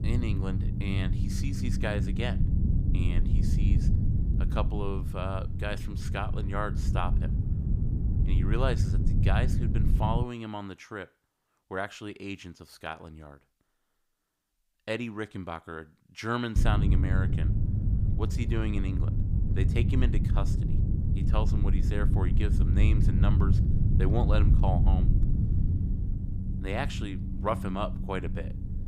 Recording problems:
low rumble; loud; until 10 s and from 17 s on; 5 dB below the speech

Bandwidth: 15.5 kHz